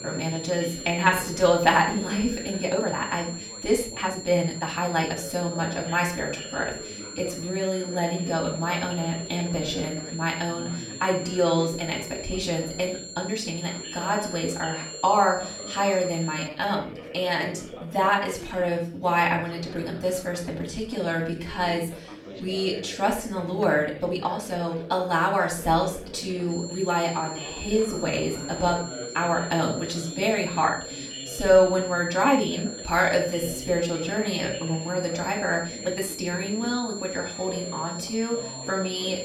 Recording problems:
off-mic speech; far
room echo; slight; dies away in 0.4 s
high-pitched whine; noticeable; until 16 s and from 27 s on; 7.5 kHz, 10 dB below the speech
background chatter; noticeable; throughout; 4 voices, 15 dB below the speech
uneven, jittery; strongly; from 1 to 36 s

